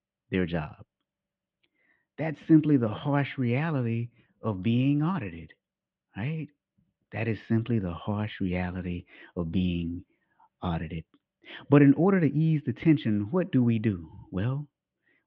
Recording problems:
muffled; very; fading above 3 kHz

